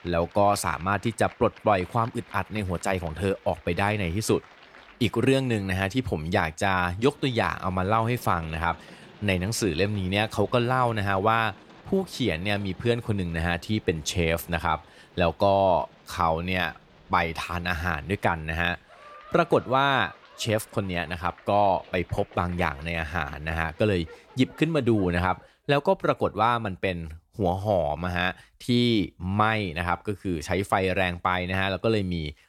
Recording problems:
crowd noise; faint; until 25 s; 25 dB below the speech

